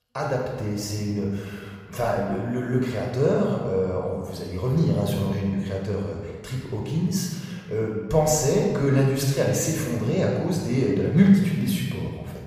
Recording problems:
room echo; noticeable; dies away in 1.5 s
off-mic speech; somewhat distant

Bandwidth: 15 kHz